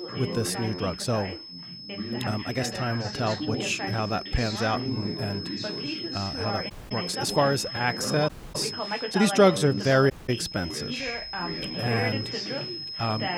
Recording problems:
high-pitched whine; loud; throughout; 5 kHz, 8 dB below the speech
background chatter; loud; throughout; 2 voices, 6 dB below the speech
uneven, jittery; strongly; from 1 to 12 s
audio cutting out; at 6.5 s, at 8.5 s and at 10 s

